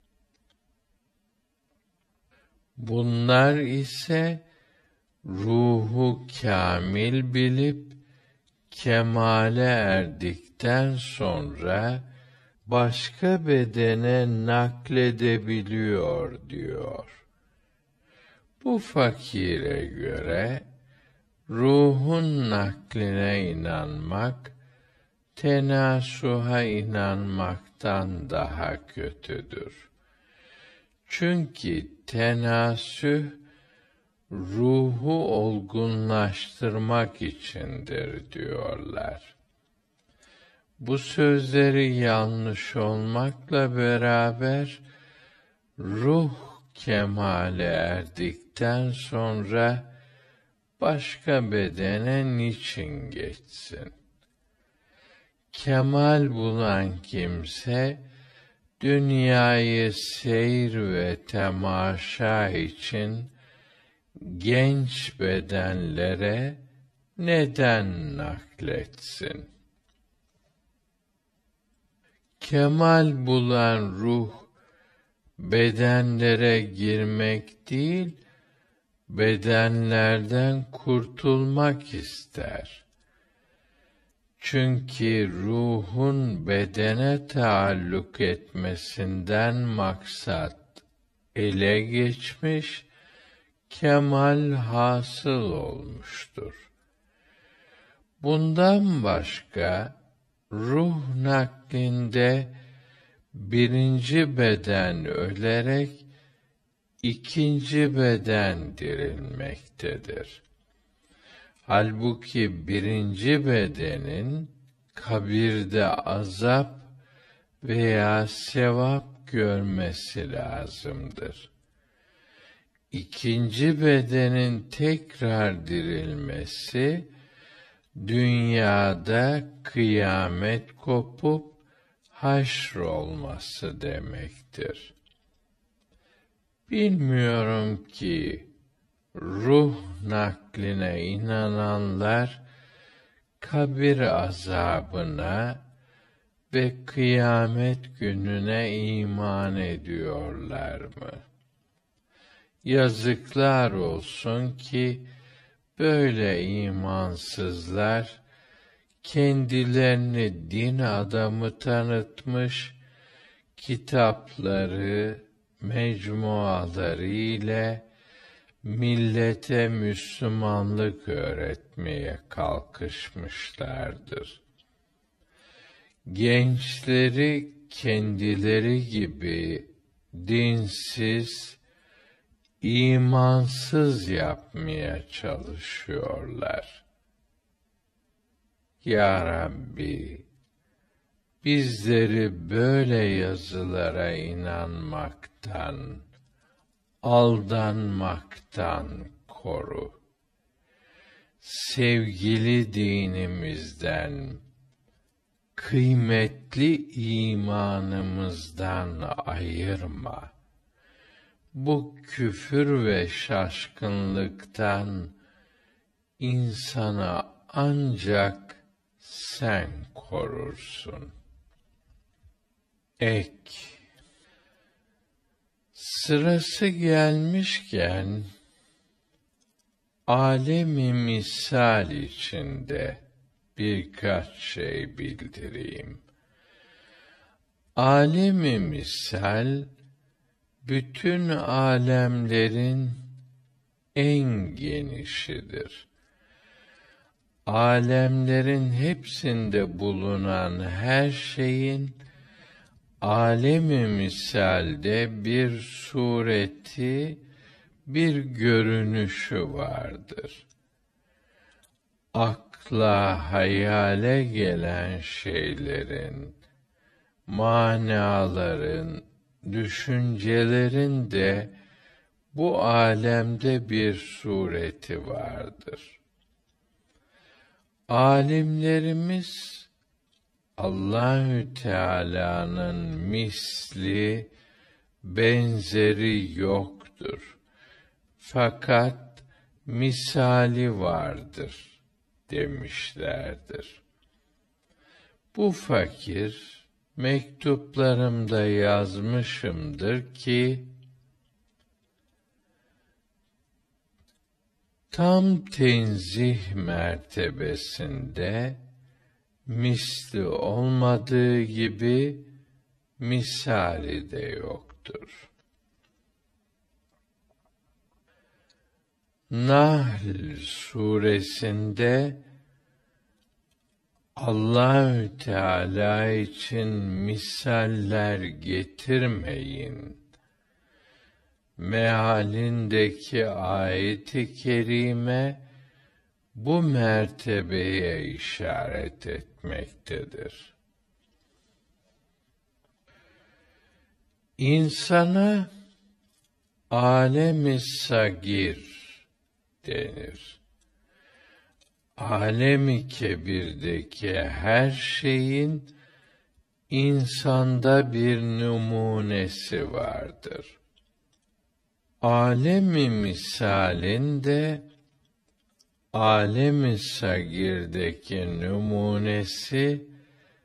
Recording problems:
wrong speed, natural pitch; too slow; 0.5 times normal speed

